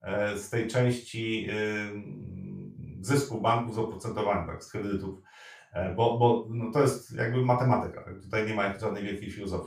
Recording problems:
off-mic speech; far
room echo; noticeable; dies away in 0.3 s

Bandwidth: 15 kHz